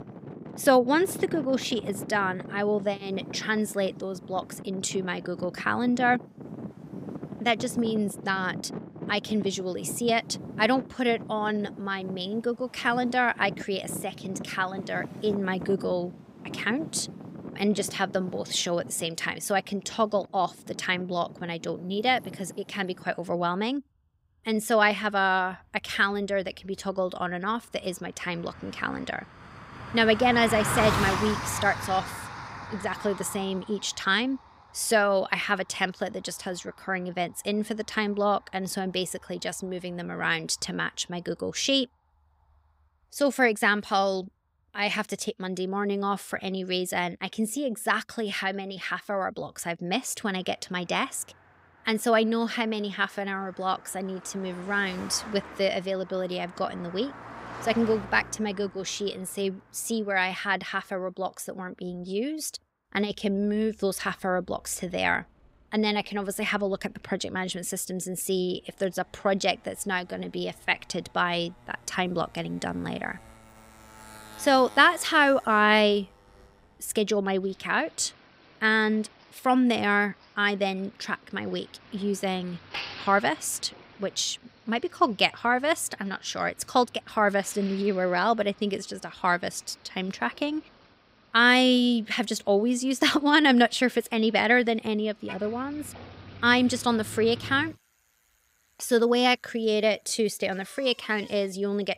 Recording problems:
traffic noise; noticeable; throughout; 15 dB below the speech

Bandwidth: 15.5 kHz